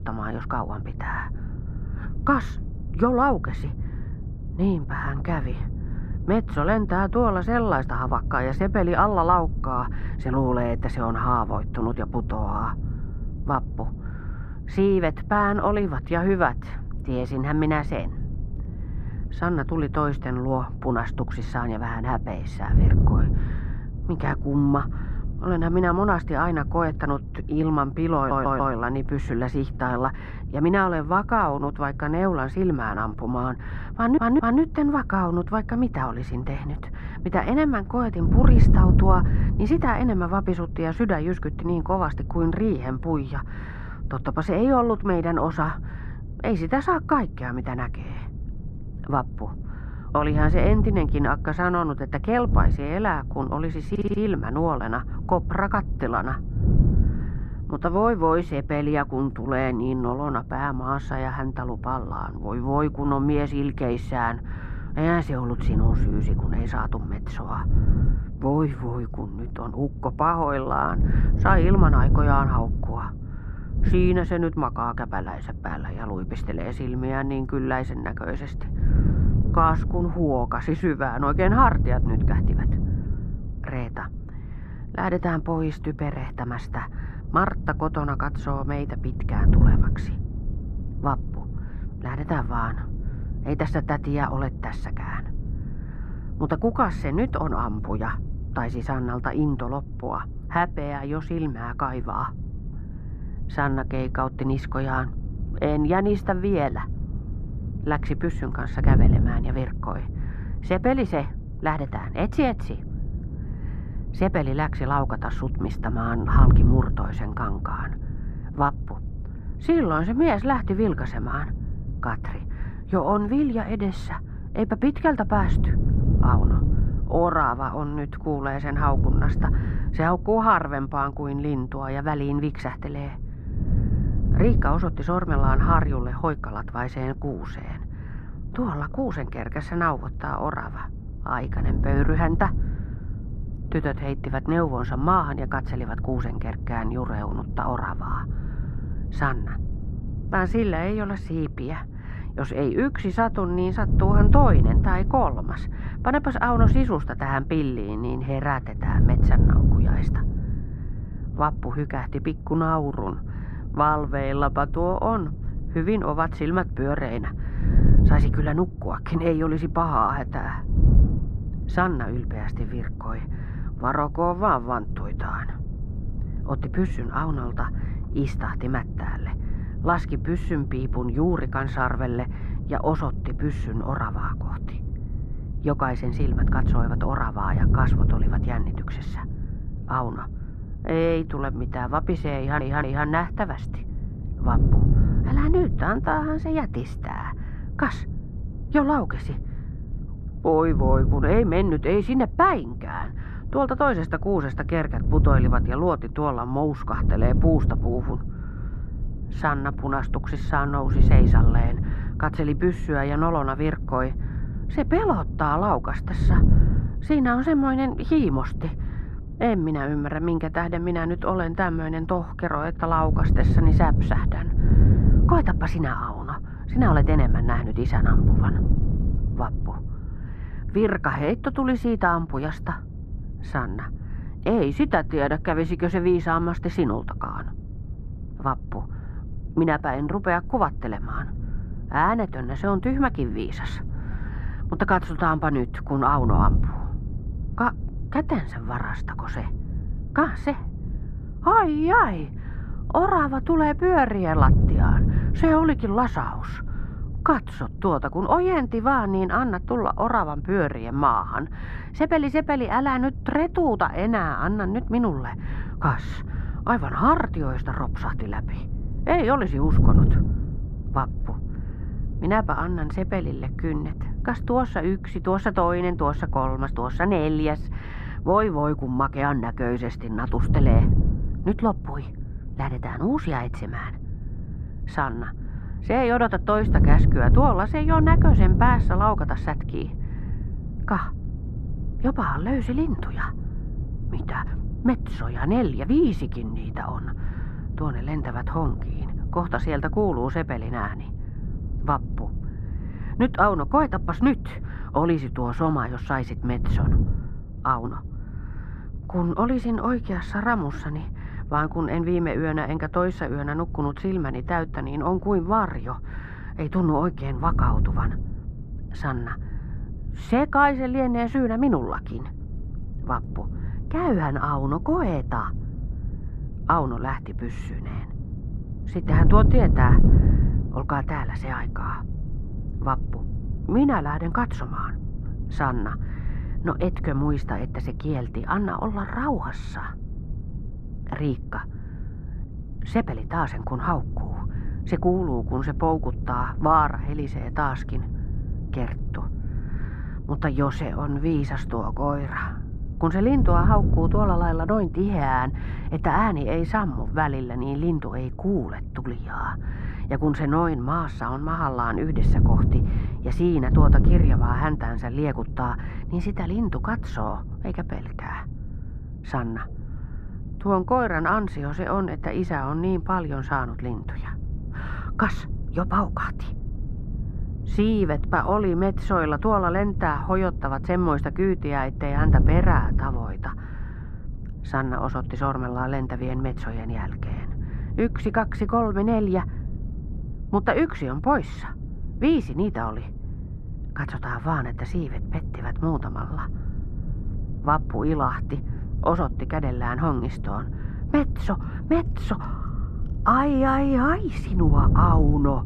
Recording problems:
muffled; very; fading above 3 kHz
wind noise on the microphone; occasional gusts; 15 dB below the speech
audio stuttering; 4 times, first at 28 s

